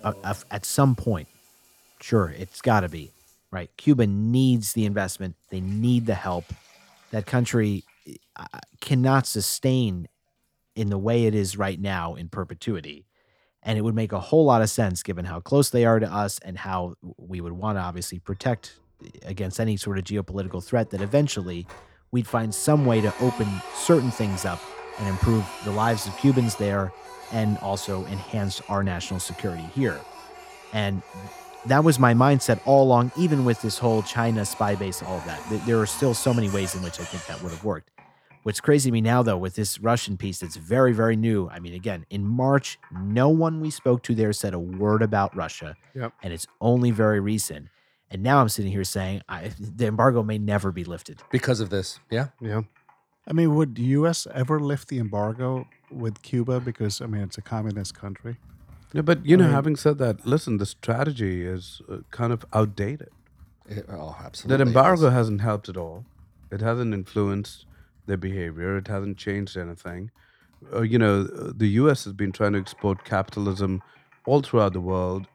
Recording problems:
household noises; noticeable; throughout; 20 dB below the speech

